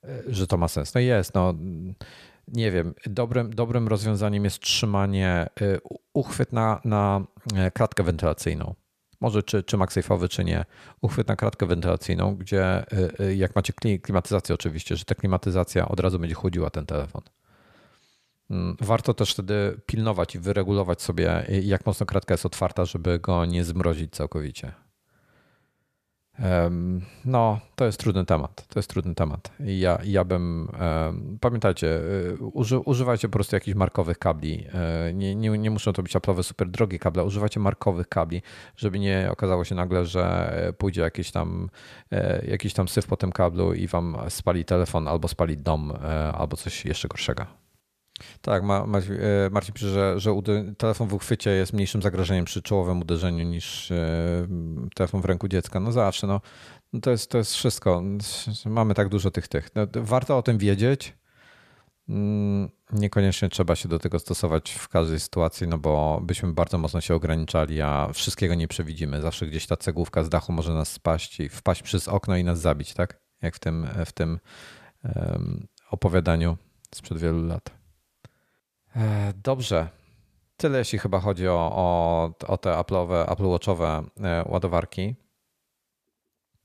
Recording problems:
none

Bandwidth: 14.5 kHz